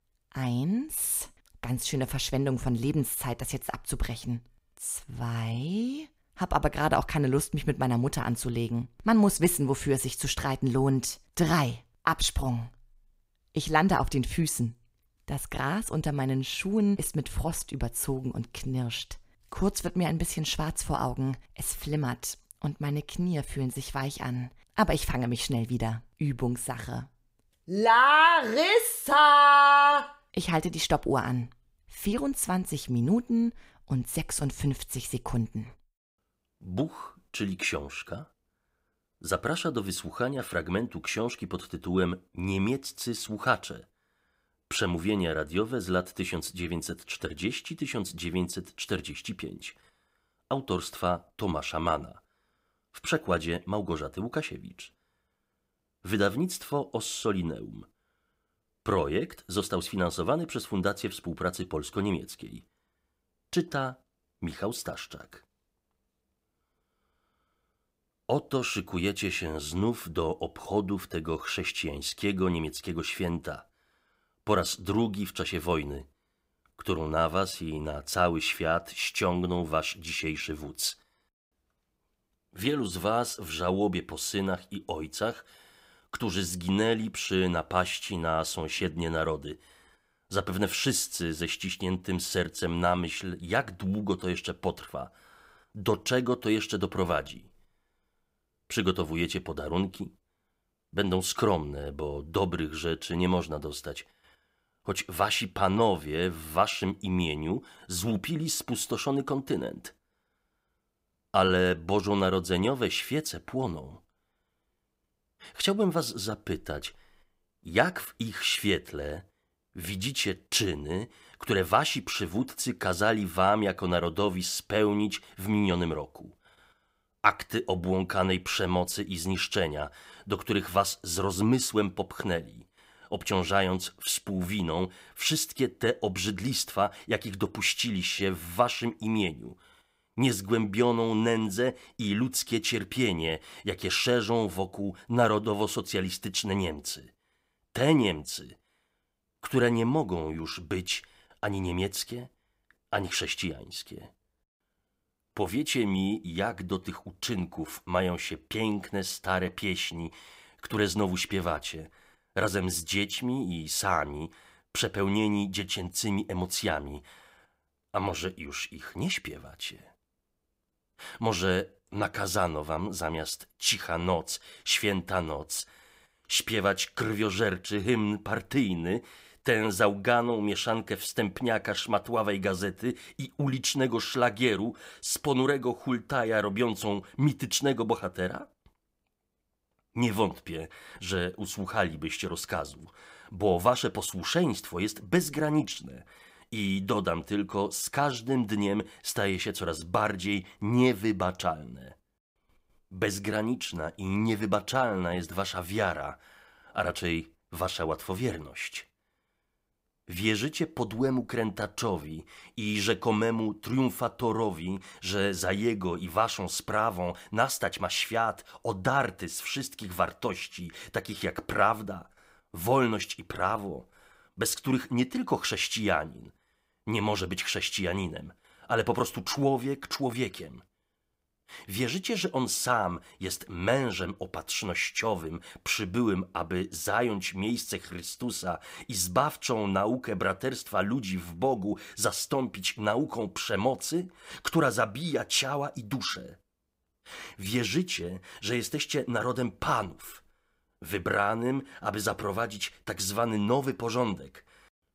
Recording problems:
none

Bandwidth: 15.5 kHz